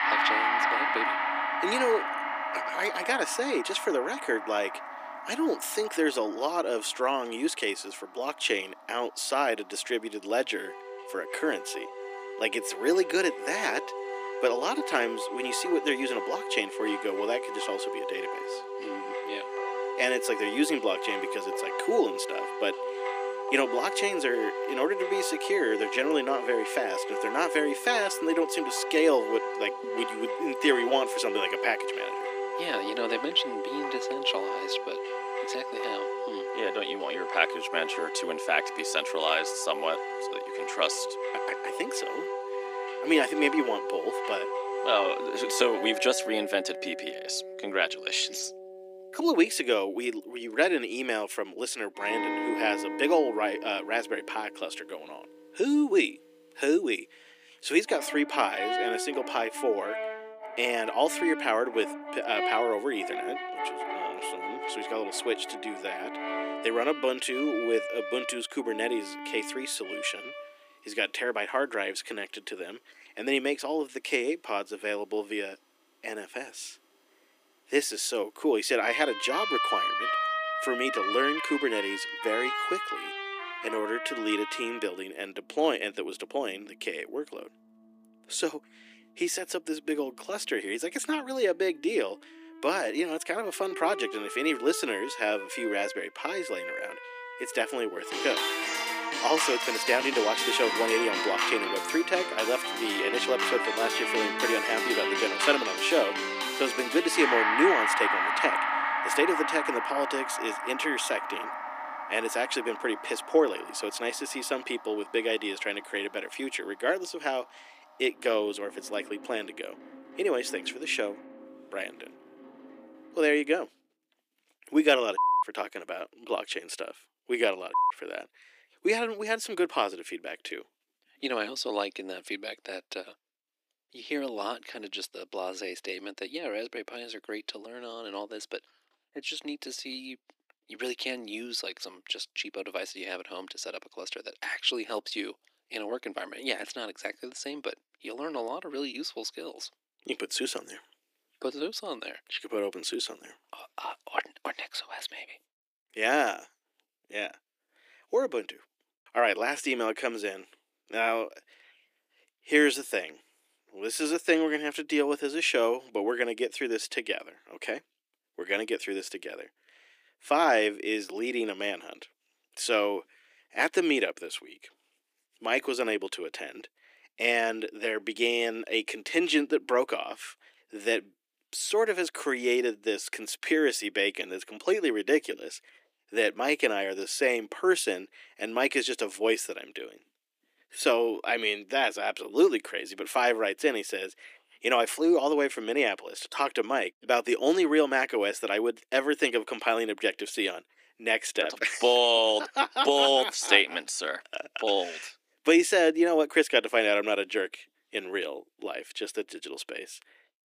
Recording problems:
thin; somewhat; fading below 300 Hz
background music; loud; until 2:04; 3 dB below the speech

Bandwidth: 15 kHz